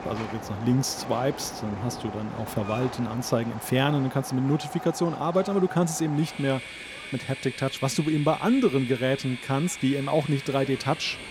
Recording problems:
train or aircraft noise; noticeable; throughout; 10 dB below the speech

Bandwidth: 17.5 kHz